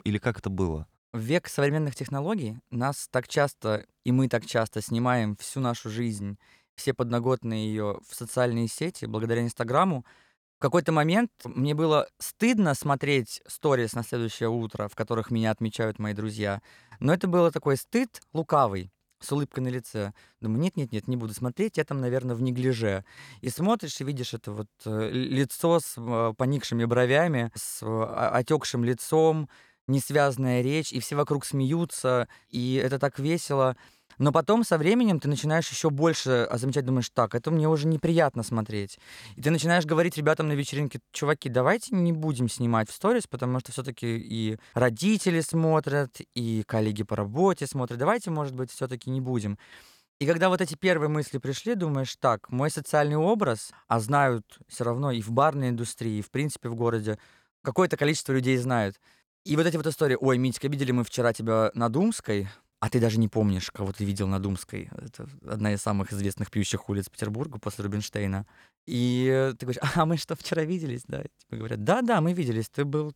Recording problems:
none

